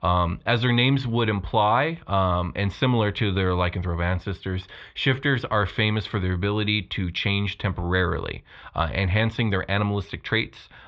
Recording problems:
muffled; very; fading above 3.5 kHz

